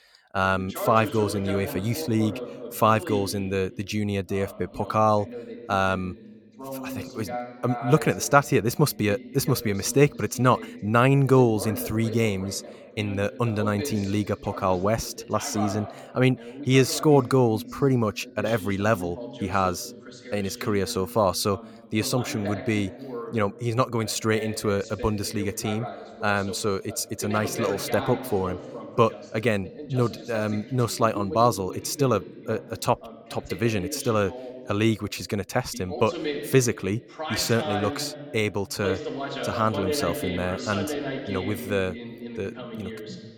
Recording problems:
voice in the background; noticeable; throughout; 10 dB below the speech

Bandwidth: 18.5 kHz